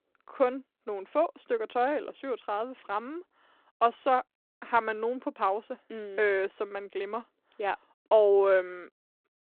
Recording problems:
phone-call audio; nothing above 4 kHz

